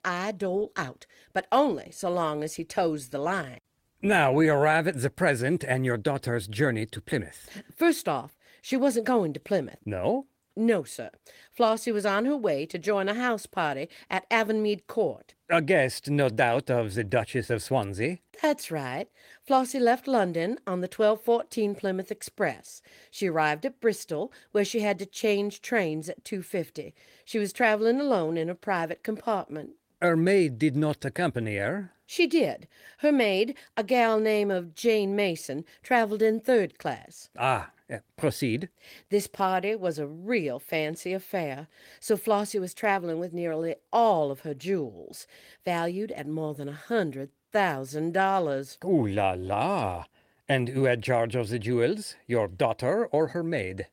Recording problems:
garbled, watery; slightly; nothing above 16.5 kHz

